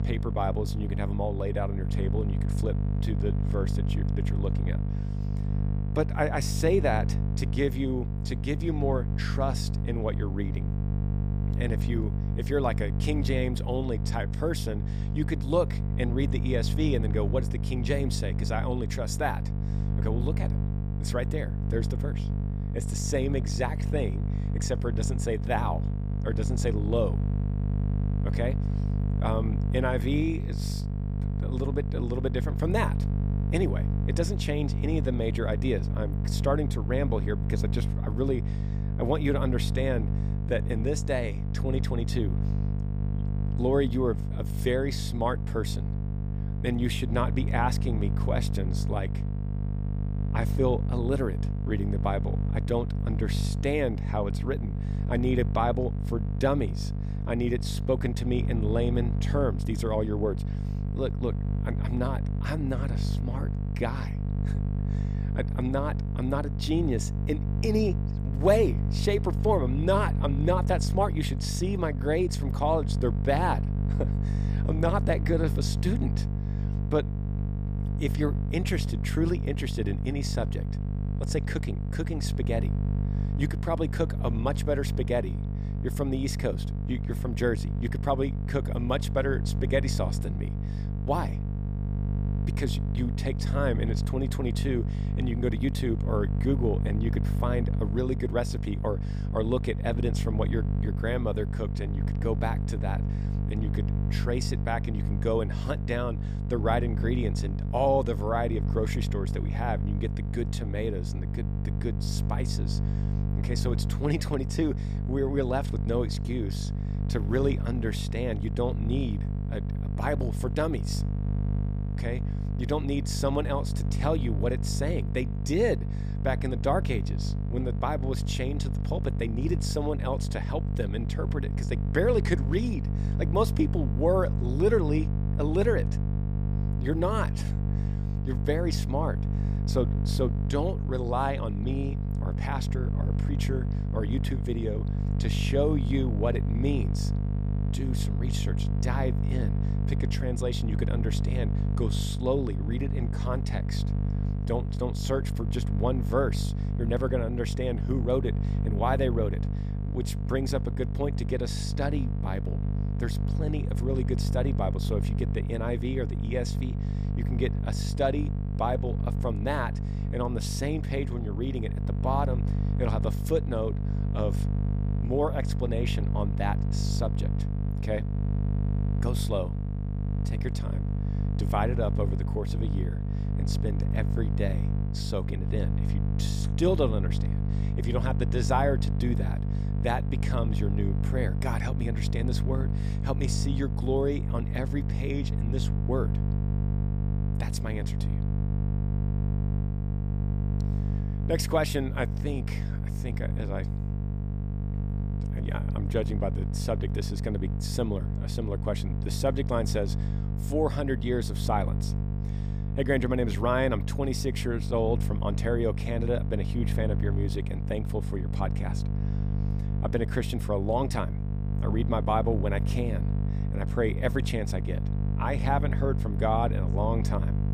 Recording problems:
electrical hum; loud; throughout; 50 Hz, 9 dB below the speech

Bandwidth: 15 kHz